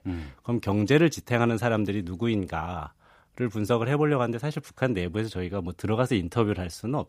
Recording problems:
none

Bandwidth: 15 kHz